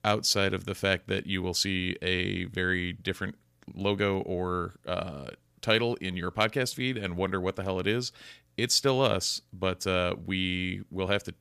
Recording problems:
none

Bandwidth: 15 kHz